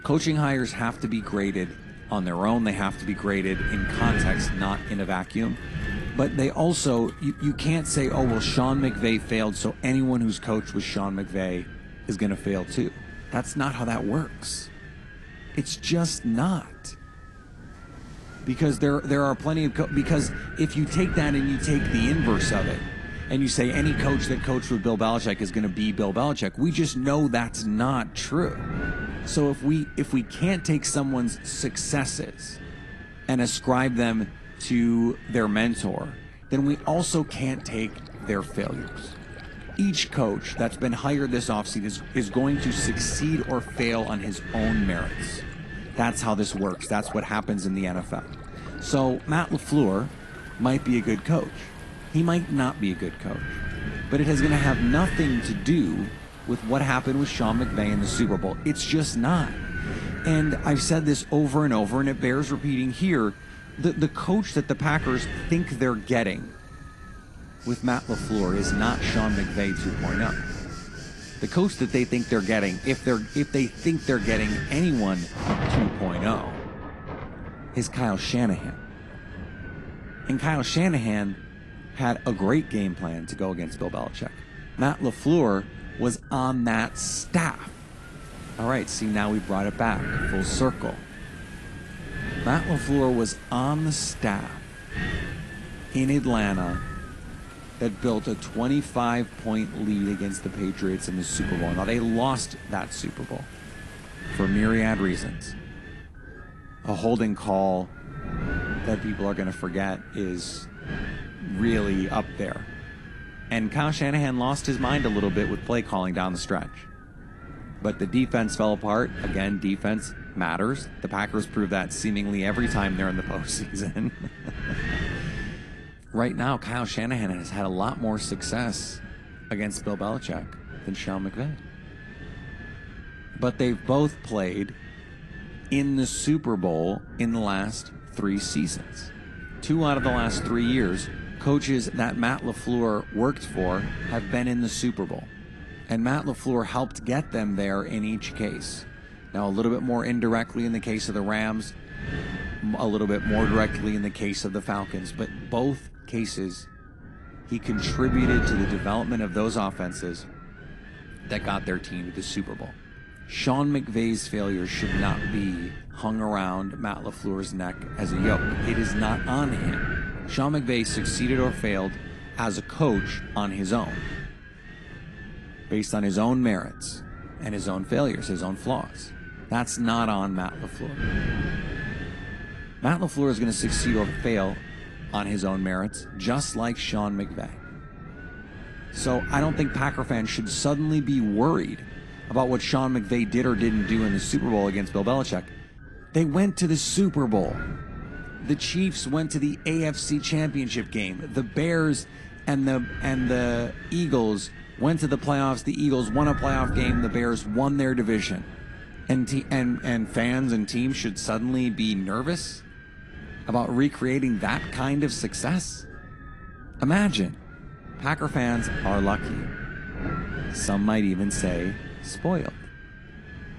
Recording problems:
garbled, watery; slightly
wind noise on the microphone; heavy; 9 dB below the speech
rain or running water; noticeable; until 2:14; 20 dB below the speech

